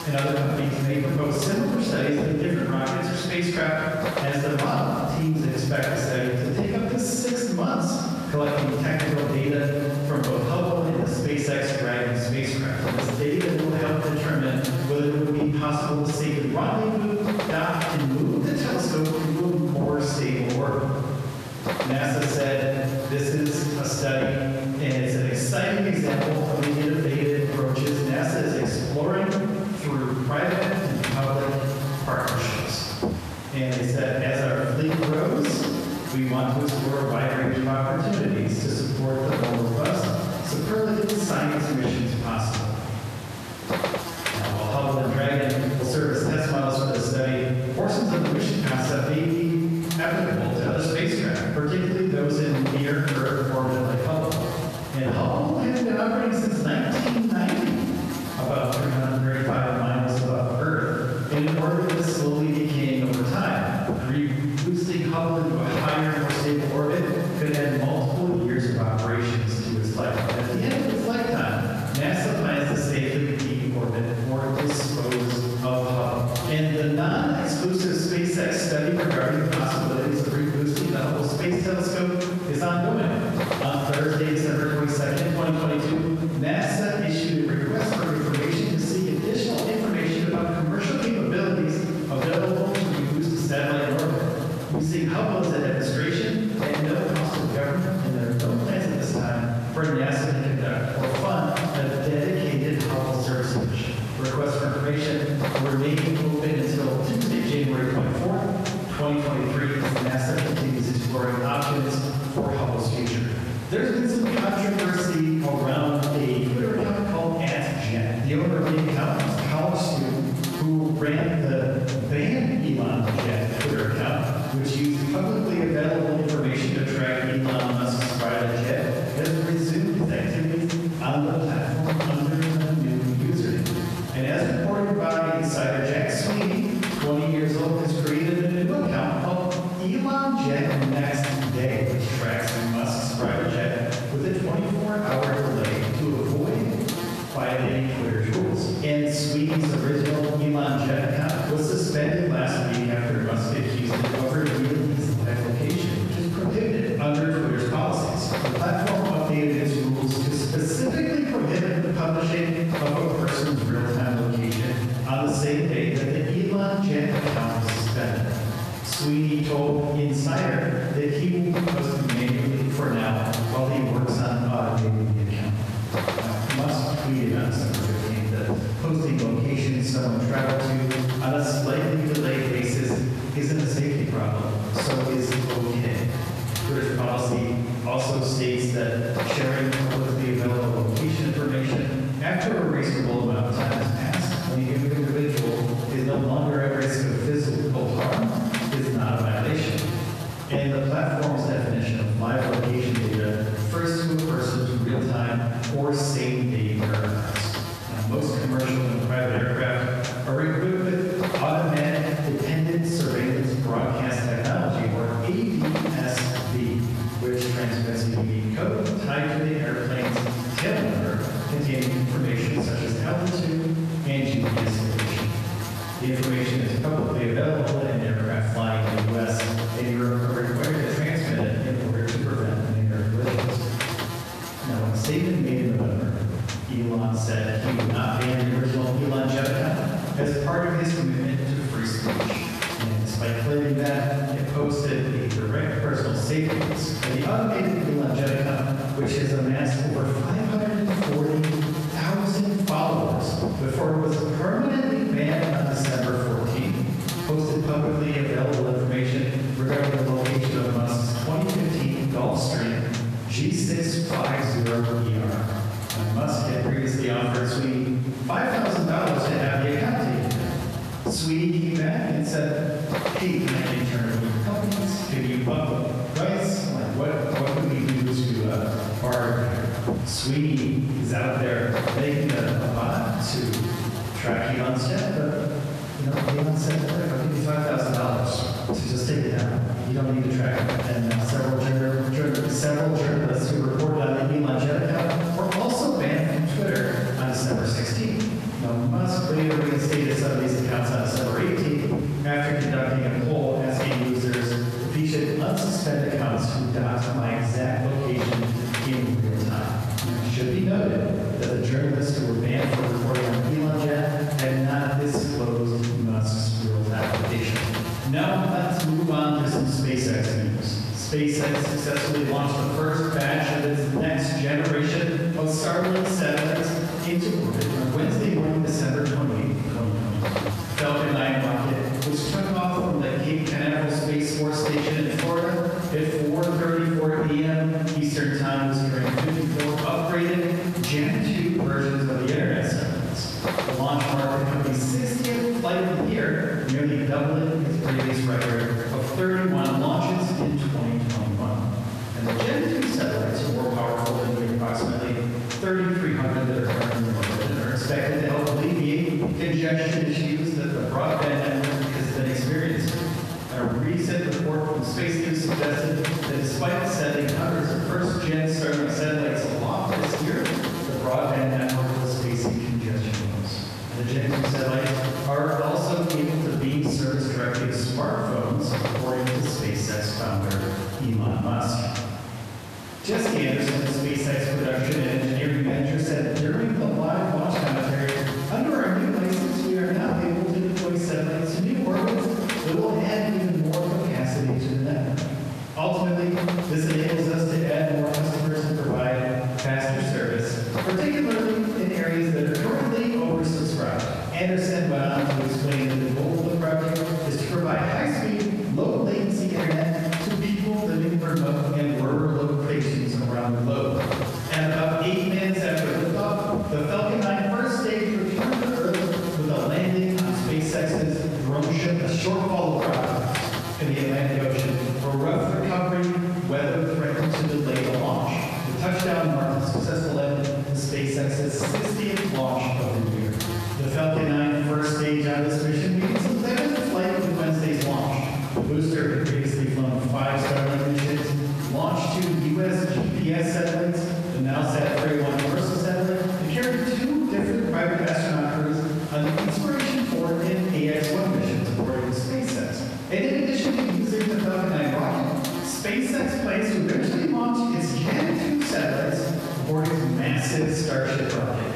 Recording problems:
room echo; strong; dies away in 1.5 s
off-mic speech; far
squashed, flat; somewhat
electrical hum; loud; throughout; 50 Hz, 8 dB below the speech

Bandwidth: 14 kHz